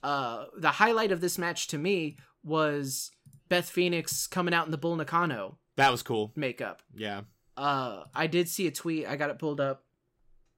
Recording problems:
none

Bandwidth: 16 kHz